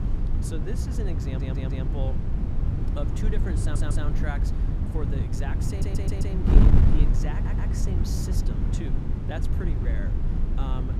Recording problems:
wind noise on the microphone; heavy; 1 dB above the speech
audio stuttering; 4 times, first at 1.5 s

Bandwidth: 14.5 kHz